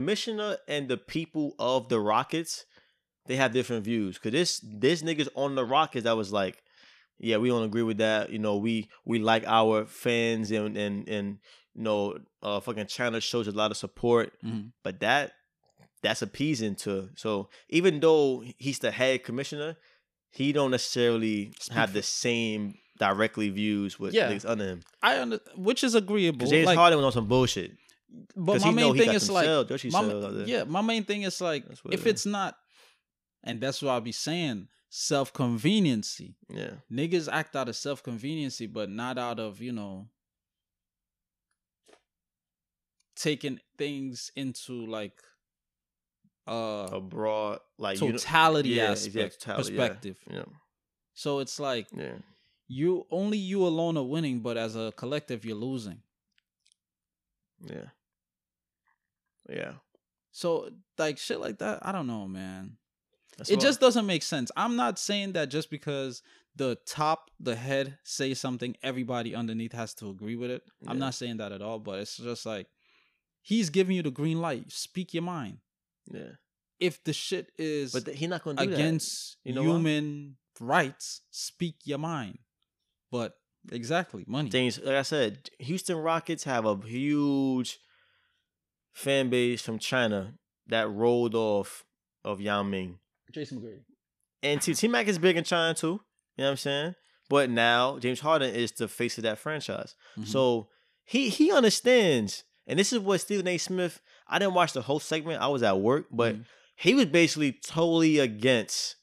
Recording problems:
abrupt cut into speech; at the start

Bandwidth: 14.5 kHz